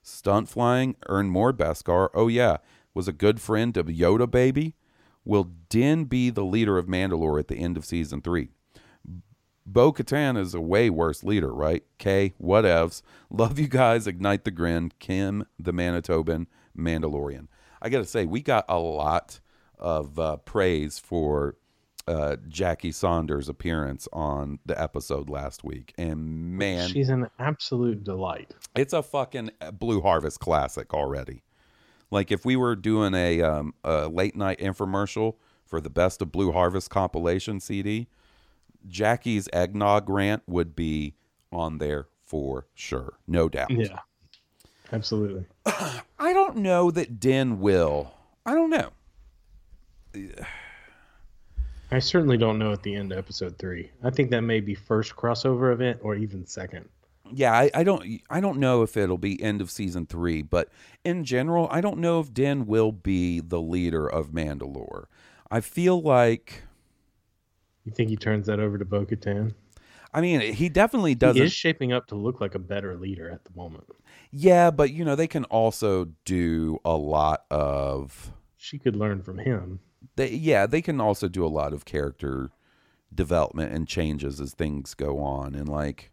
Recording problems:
none

